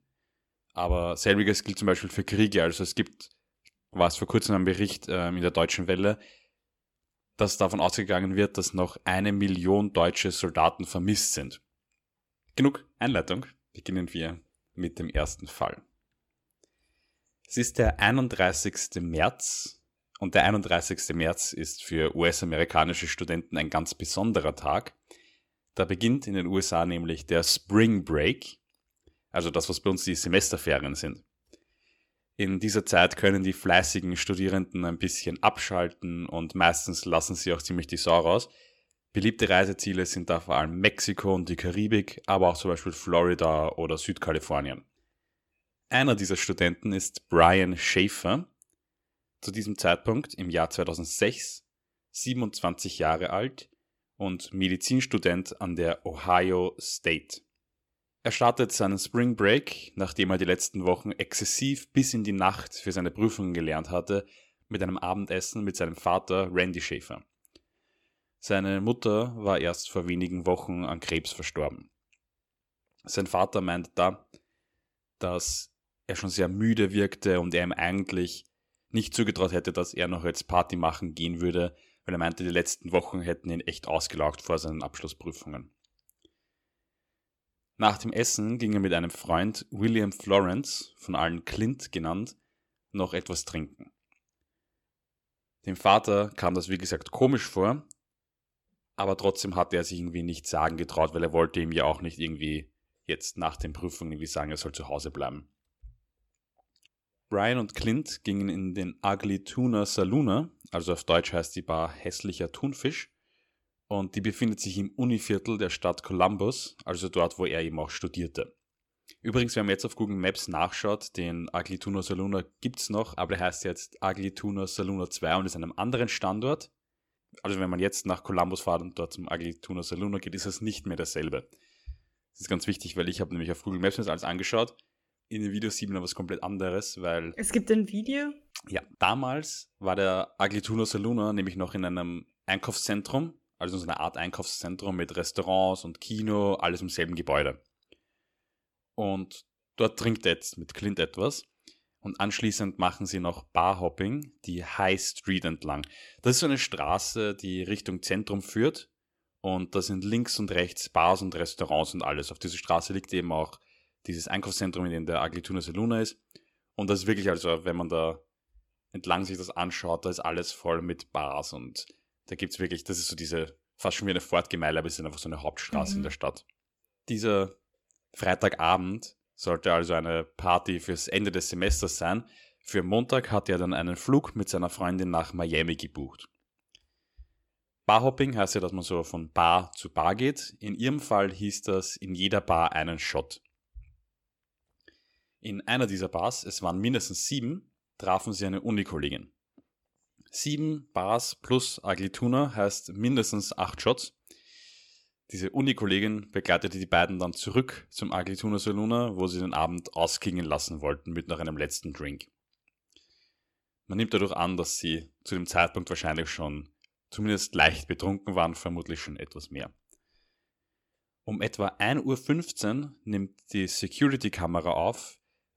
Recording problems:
none

